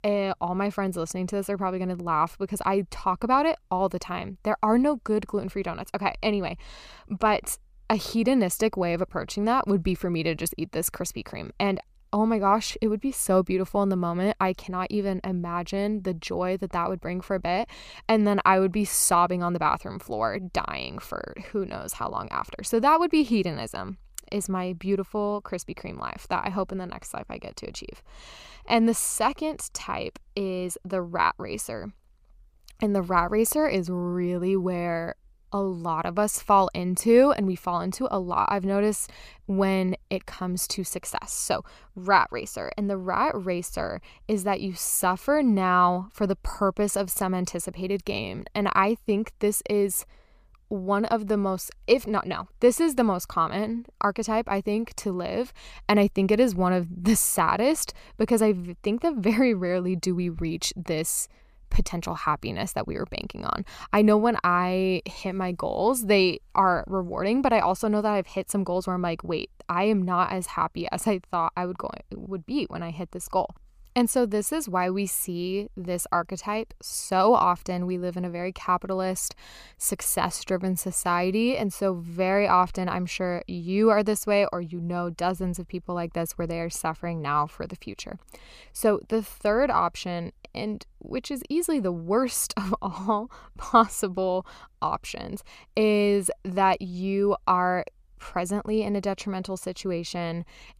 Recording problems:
none

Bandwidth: 15 kHz